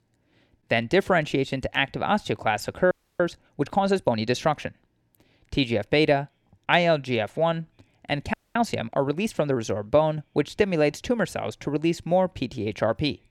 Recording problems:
audio freezing; at 3 s and at 8.5 s

